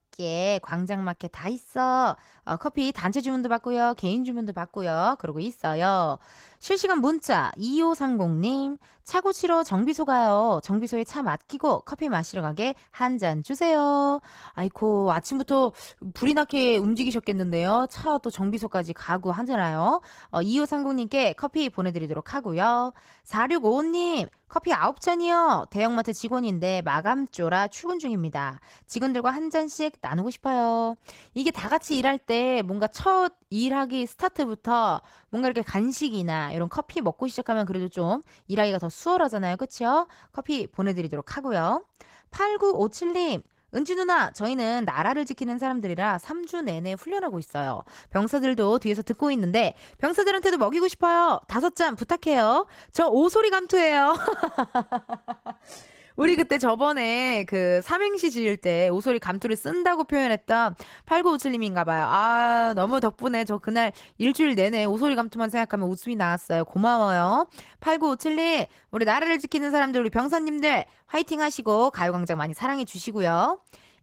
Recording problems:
garbled, watery; slightly; nothing above 16 kHz

